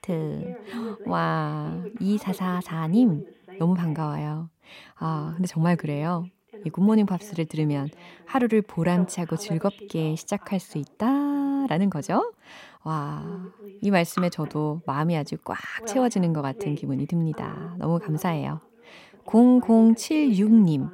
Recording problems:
voice in the background; noticeable; throughout; 20 dB below the speech

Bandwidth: 16 kHz